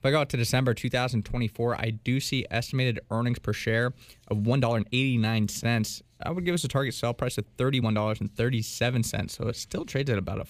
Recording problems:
uneven, jittery; strongly; from 4.5 to 9.5 s

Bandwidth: 15 kHz